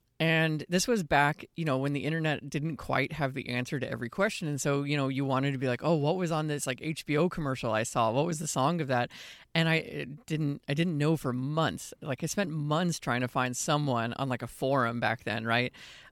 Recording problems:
none

